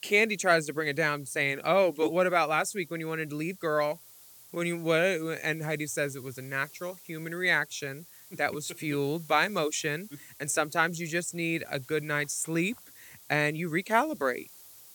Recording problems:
hiss; faint; throughout; 20 dB below the speech

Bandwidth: 18.5 kHz